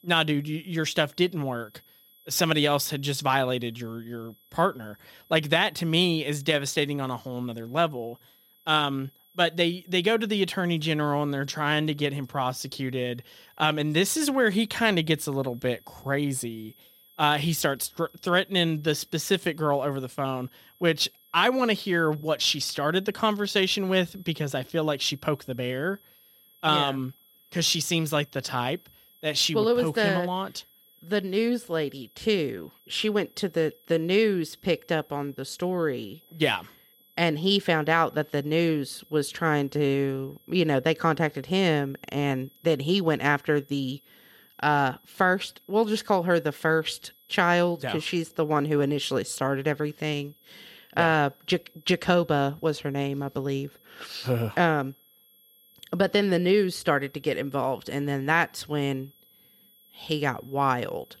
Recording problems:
high-pitched whine; faint; throughout; 11.5 kHz, 30 dB below the speech

